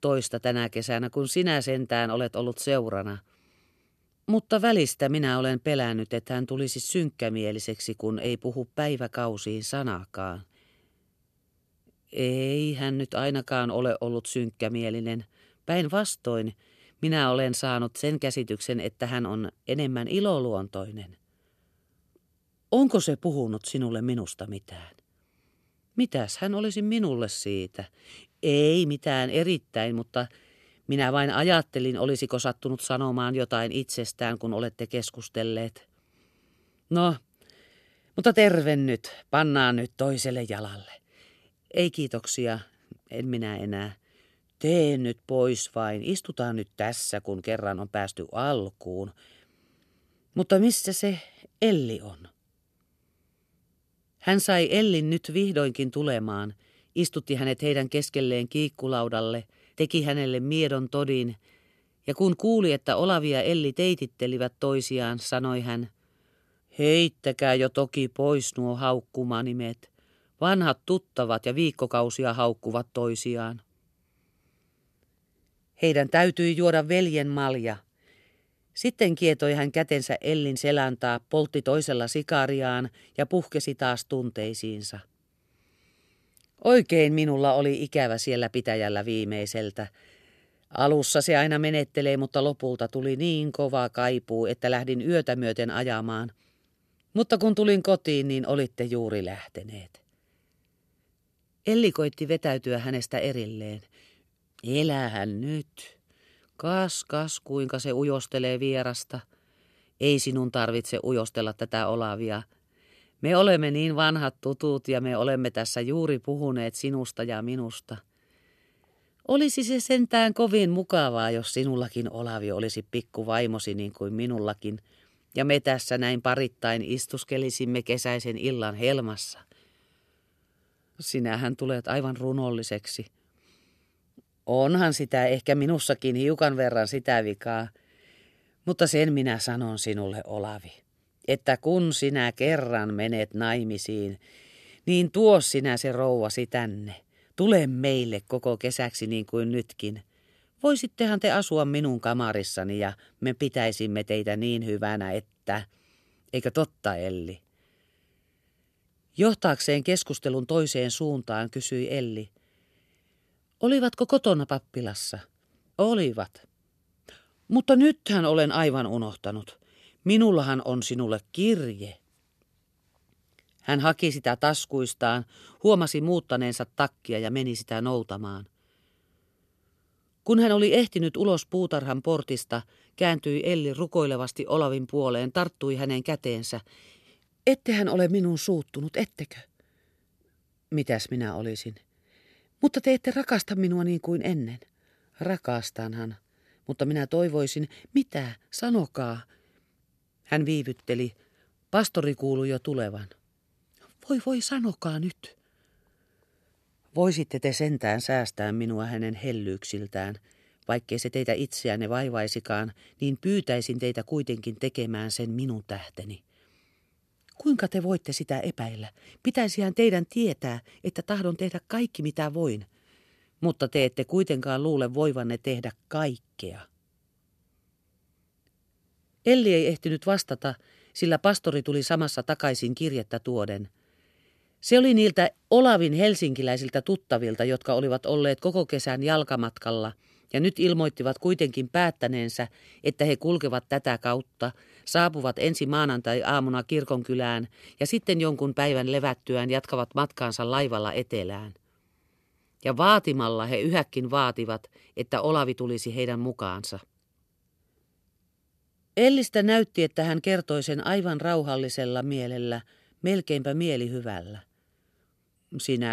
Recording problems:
abrupt cut into speech; at the end

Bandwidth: 13.5 kHz